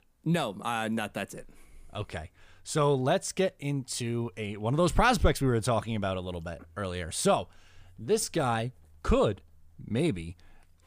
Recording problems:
none

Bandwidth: 15 kHz